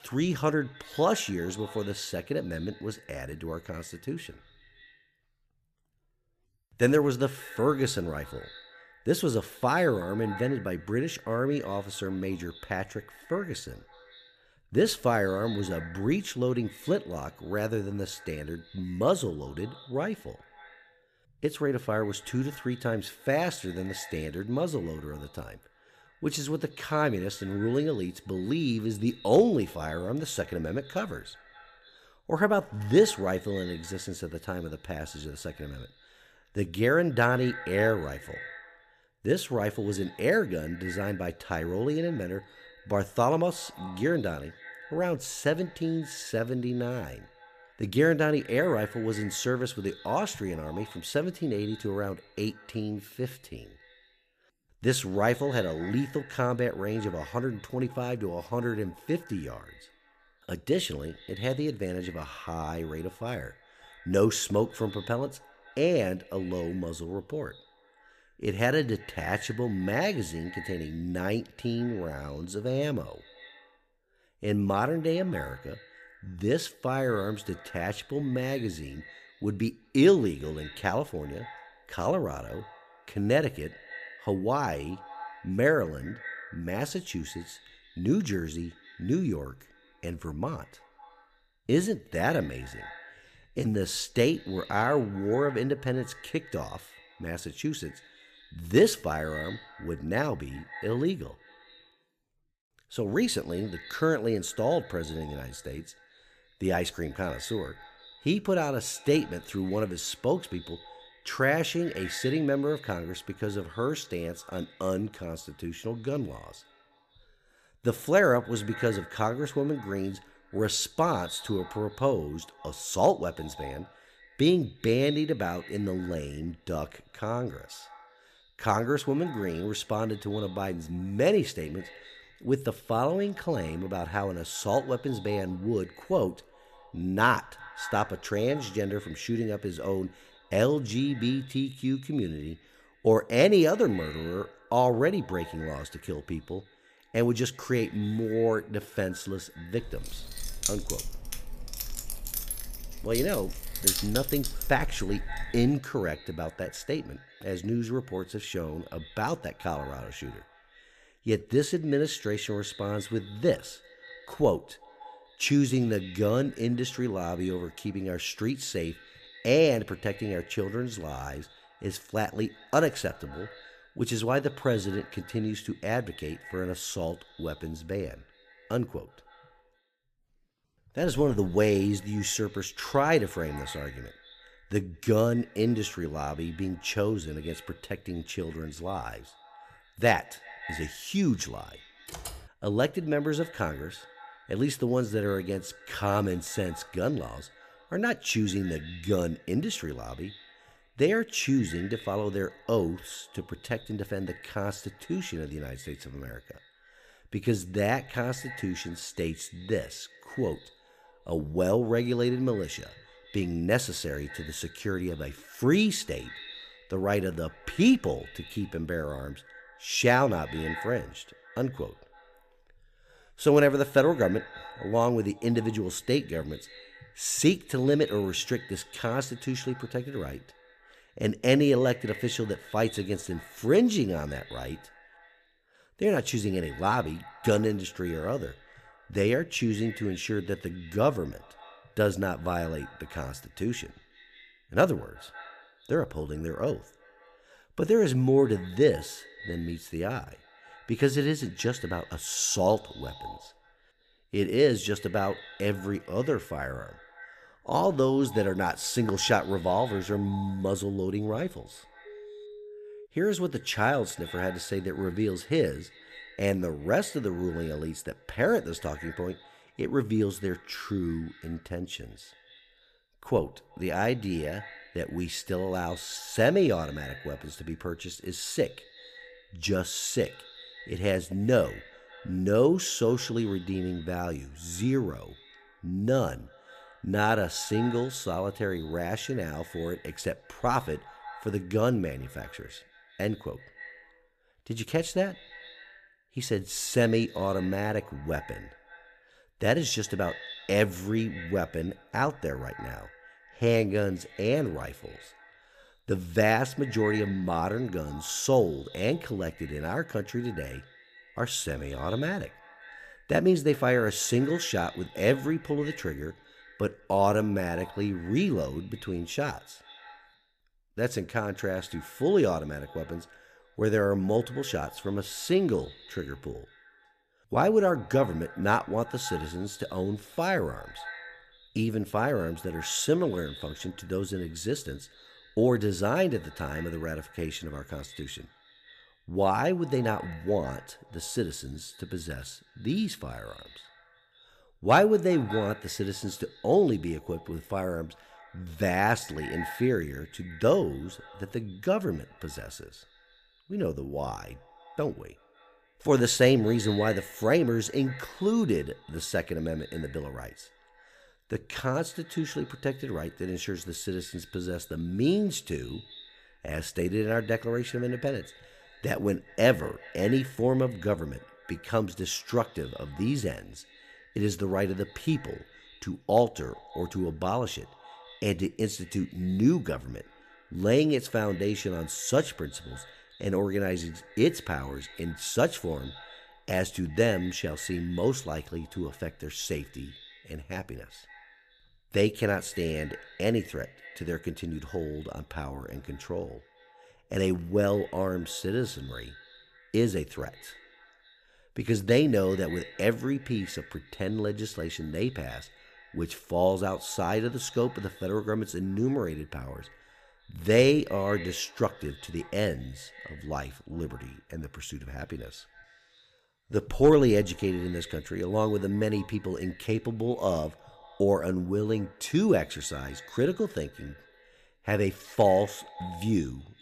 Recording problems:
echo of what is said; faint; throughout; 180 ms later, 20 dB below the speech
jangling keys; loud; from 2:30 to 2:36; peak 4 dB above the speech
keyboard typing; faint; at 3:12; peak 10 dB below the speech
phone ringing; faint; from 4:22 to 4:23; peak 15 dB below the speech

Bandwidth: 14.5 kHz